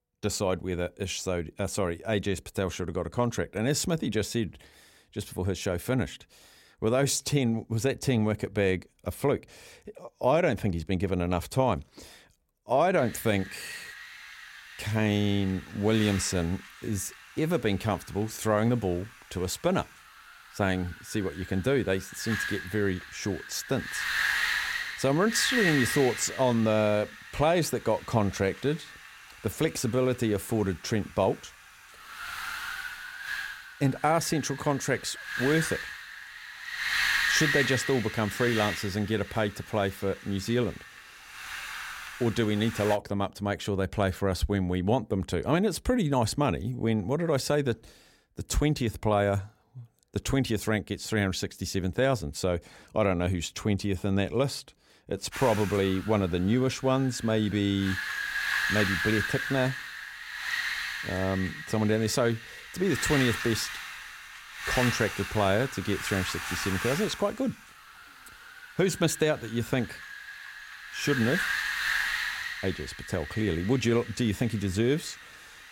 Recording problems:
wind noise on the microphone; heavy; from 13 to 43 s and from 55 s on; 1 dB below the speech

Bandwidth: 16.5 kHz